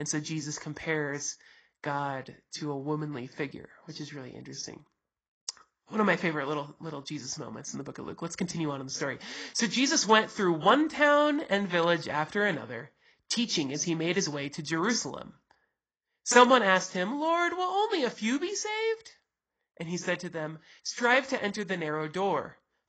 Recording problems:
garbled, watery; badly; nothing above 7.5 kHz
abrupt cut into speech; at the start

